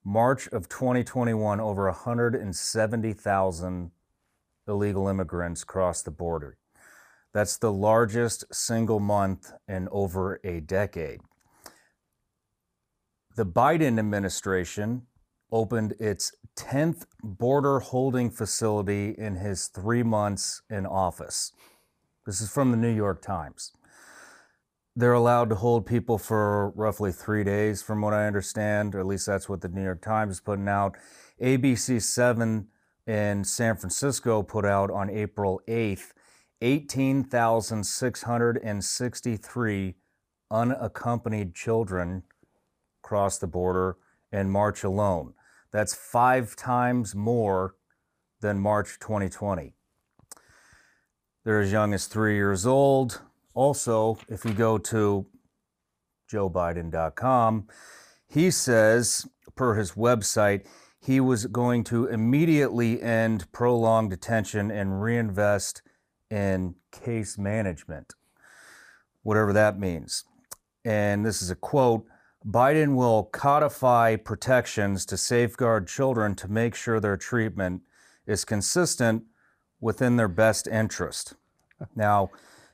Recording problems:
none

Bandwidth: 15 kHz